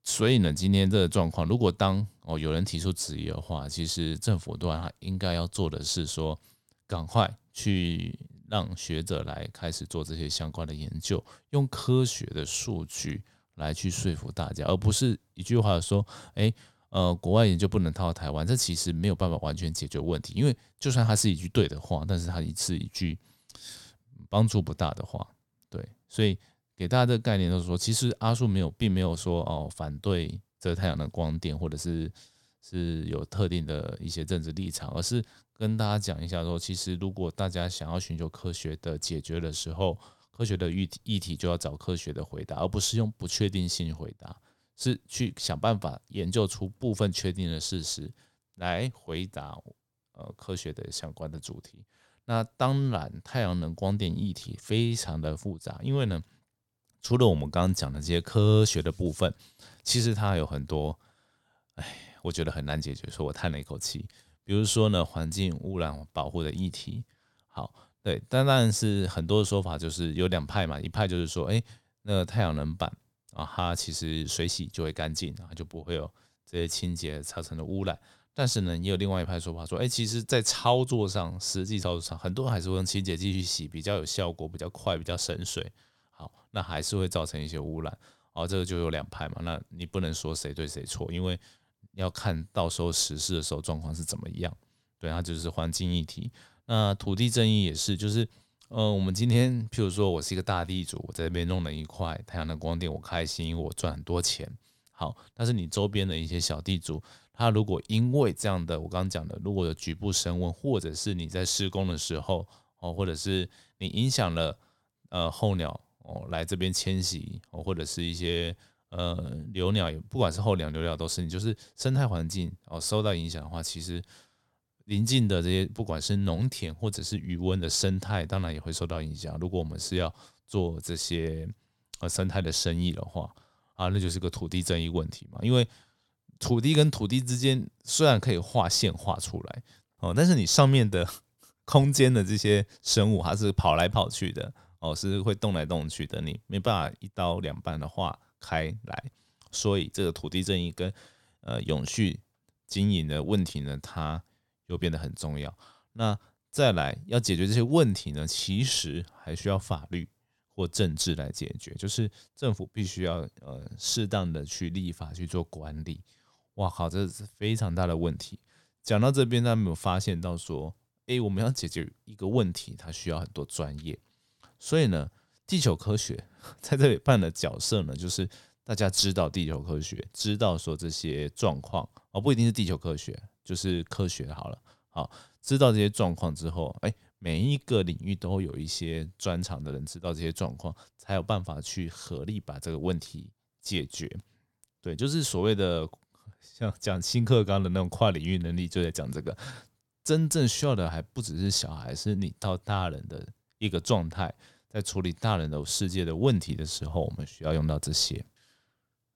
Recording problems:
none

